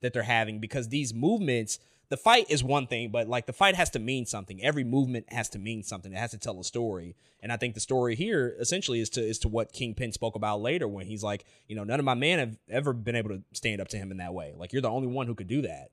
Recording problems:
none

